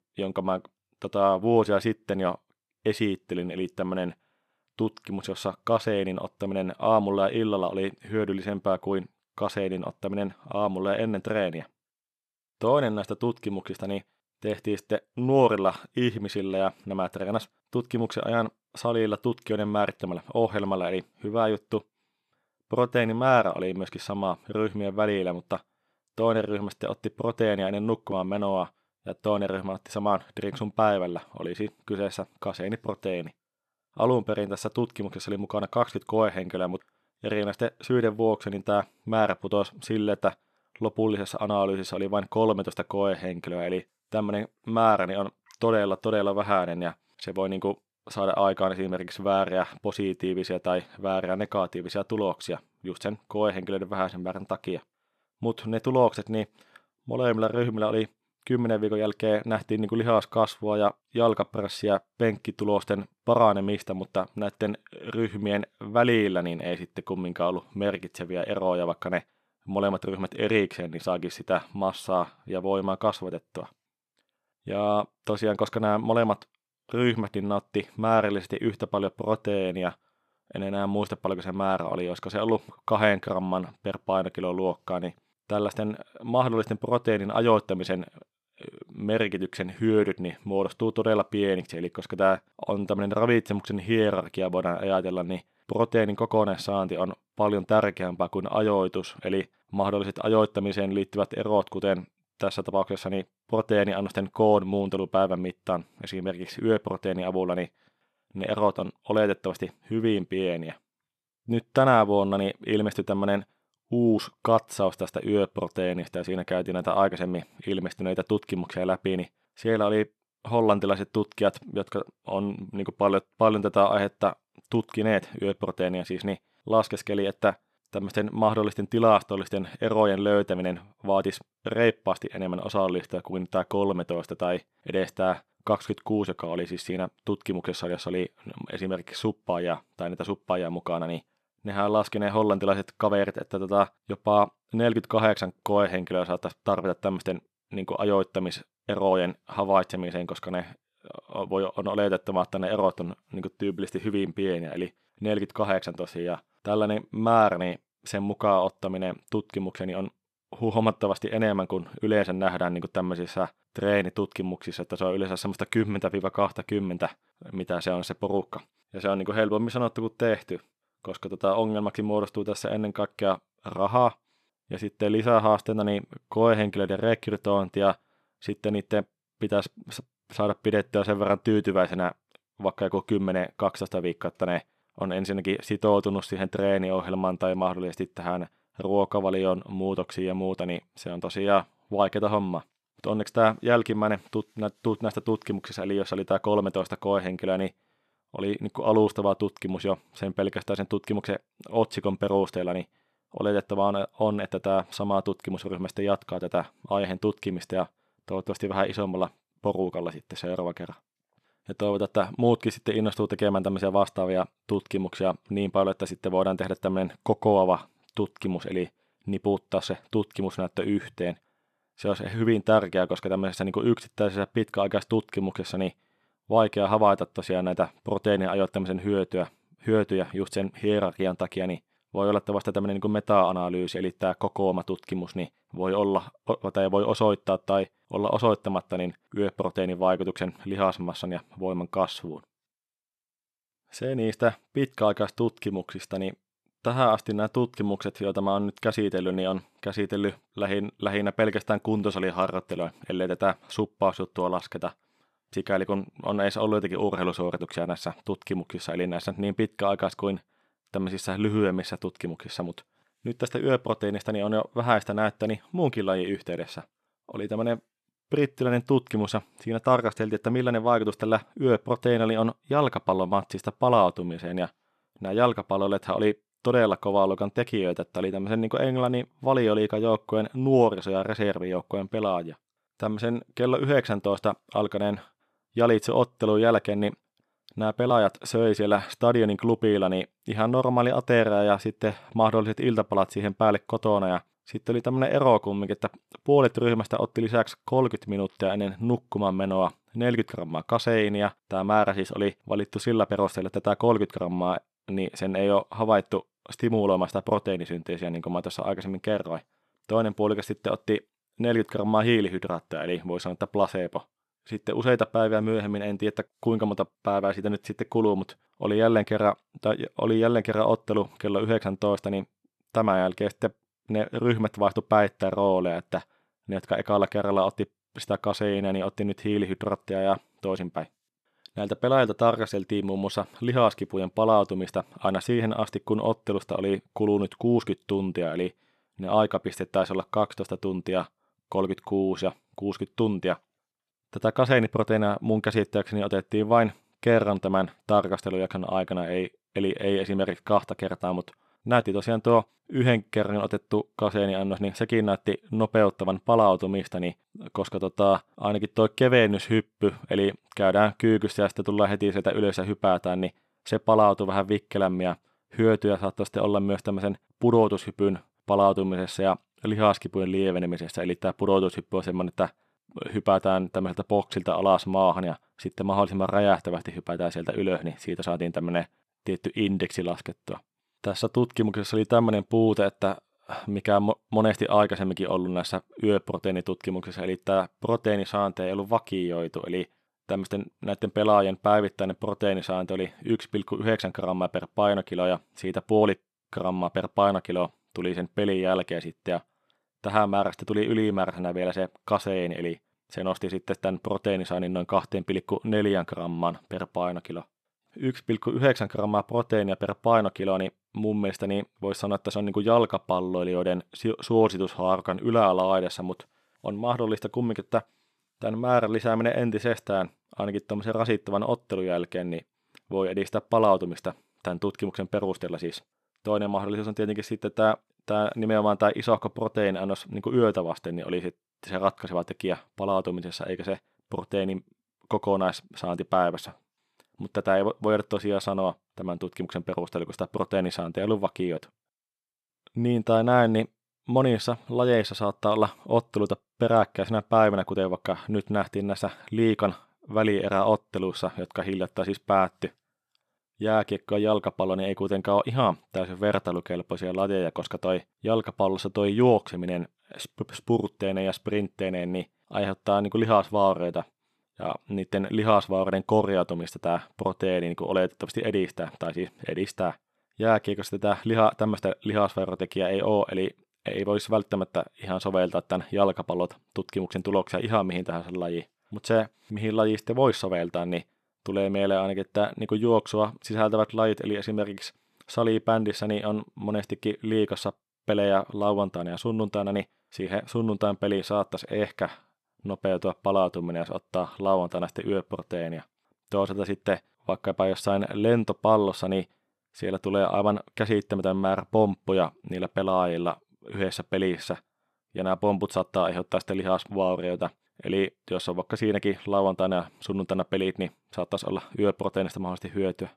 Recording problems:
none

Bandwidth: 13.5 kHz